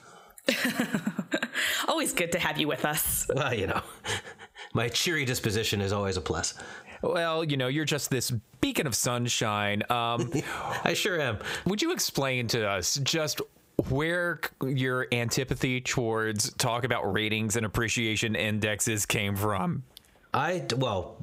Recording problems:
squashed, flat; heavily

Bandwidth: 15.5 kHz